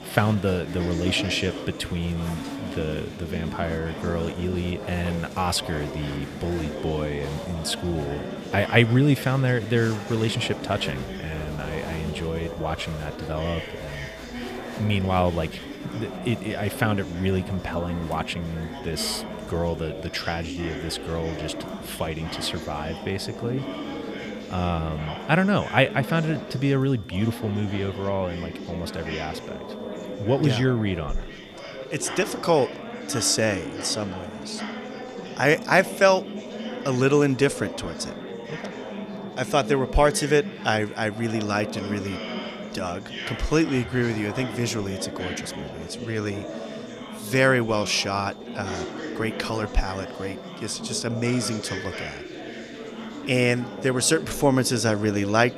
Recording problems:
chatter from many people; loud; throughout; 9 dB below the speech
high-pitched whine; faint; throughout; 3.5 kHz, 25 dB below the speech

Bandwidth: 15 kHz